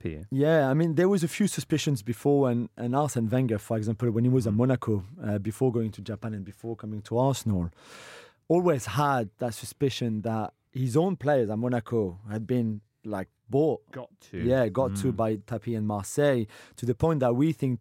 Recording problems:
none

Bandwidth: 16 kHz